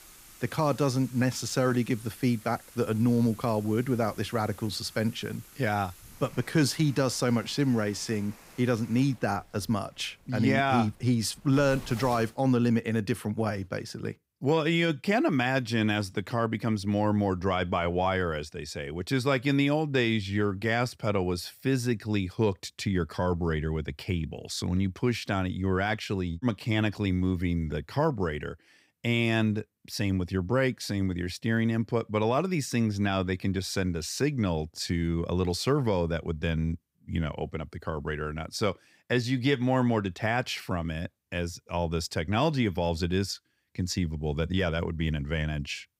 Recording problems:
rain or running water; faint; until 12 s; 20 dB below the speech

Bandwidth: 15.5 kHz